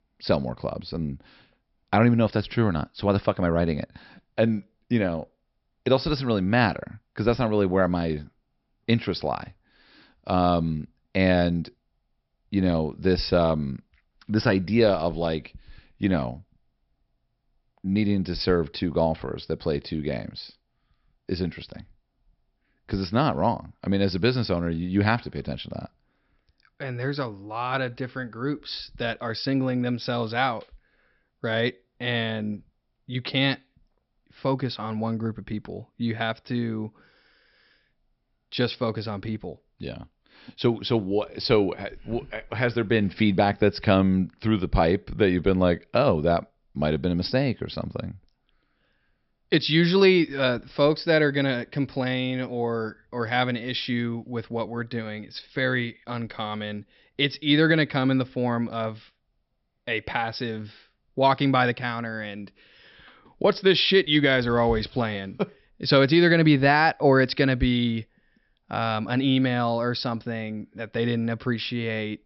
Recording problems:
high frequencies cut off; noticeable; nothing above 5.5 kHz

